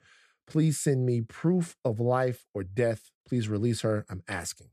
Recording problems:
none

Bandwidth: 14.5 kHz